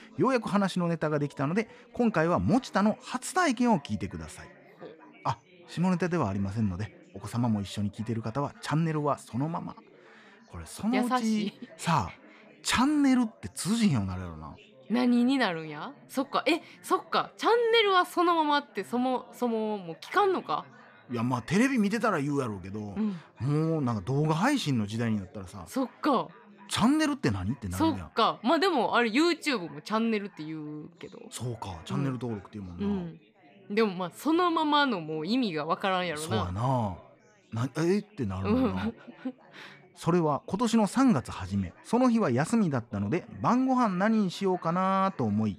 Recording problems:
chatter from many people; faint; throughout; 25 dB below the speech

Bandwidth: 14.5 kHz